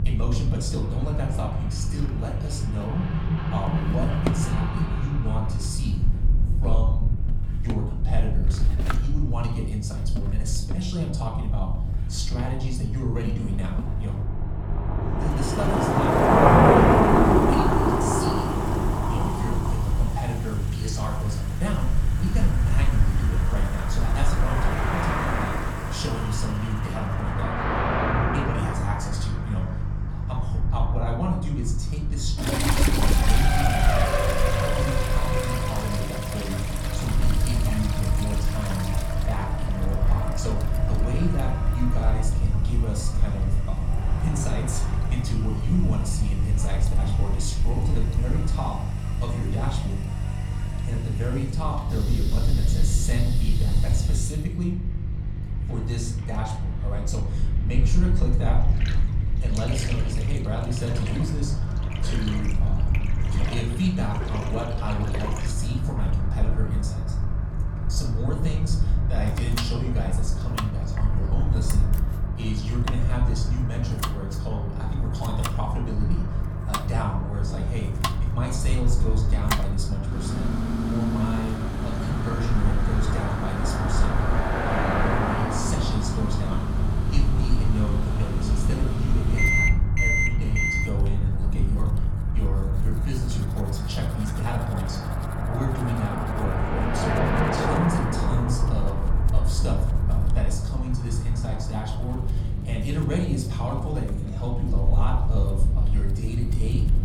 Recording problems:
off-mic speech; far
room echo; slight; dies away in 0.7 s
traffic noise; very loud; throughout; 2 dB above the speech
electrical hum; loud; throughout; 50 Hz, 9 dB below the speech
household noises; loud; throughout; 3 dB below the speech
low rumble; noticeable; throughout; 10 dB below the speech

